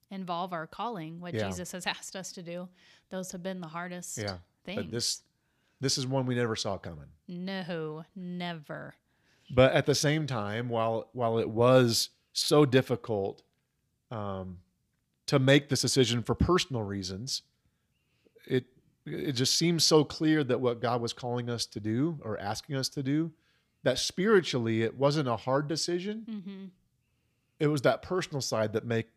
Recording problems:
none

